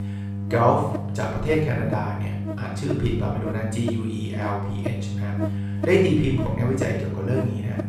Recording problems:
off-mic speech; far
room echo; noticeable; dies away in 0.7 s
electrical hum; loud; throughout; 50 Hz, 9 dB below the speech

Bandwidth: 15.5 kHz